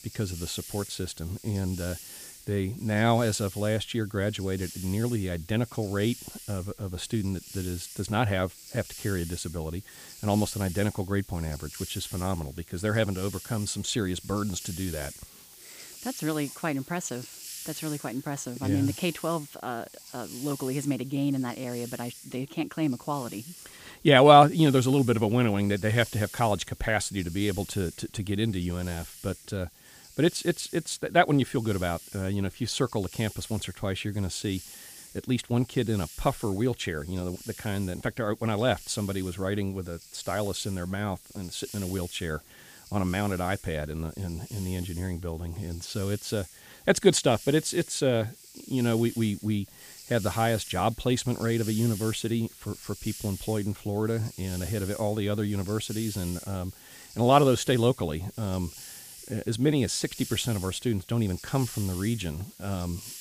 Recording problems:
hiss; noticeable; throughout; 15 dB below the speech

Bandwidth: 15 kHz